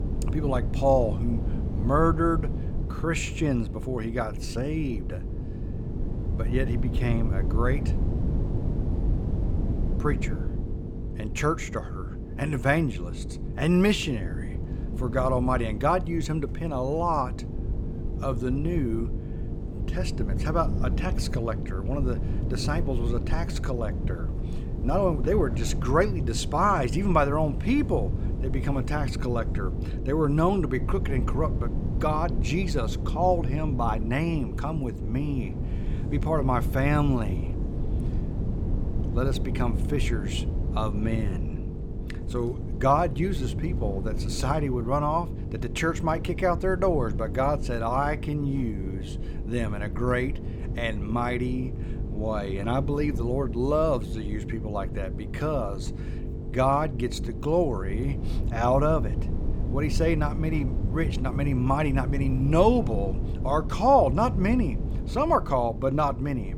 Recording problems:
electrical hum; noticeable; throughout; 50 Hz, 20 dB below the speech
wind noise on the microphone; occasional gusts; 15 dB below the speech

